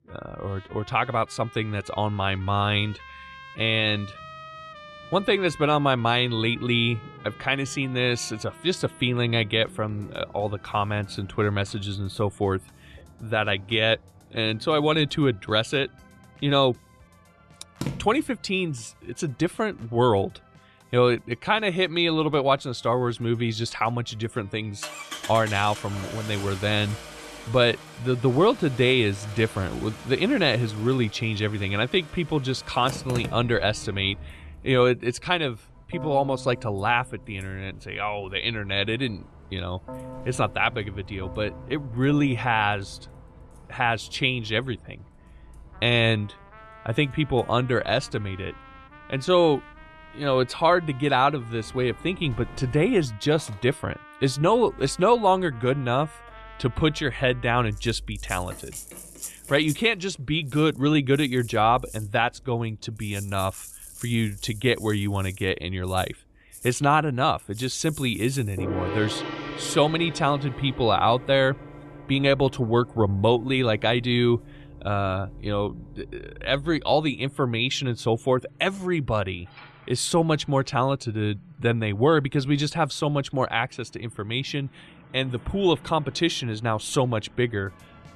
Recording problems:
background music; noticeable; throughout; 20 dB below the speech
traffic noise; faint; throughout; 20 dB below the speech

